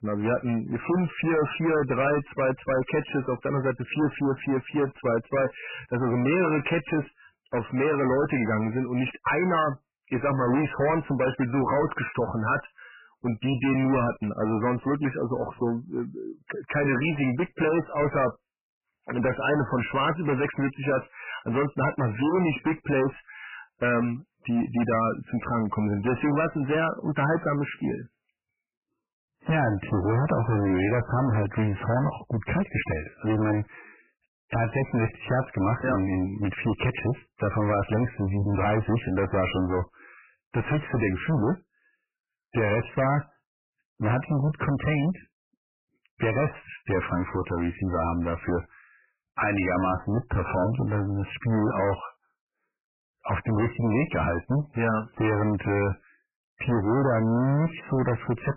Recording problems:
distortion; heavy; 20% of the sound clipped
garbled, watery; badly; nothing above 3 kHz

